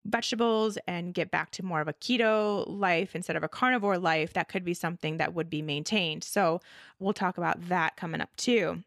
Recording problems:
none

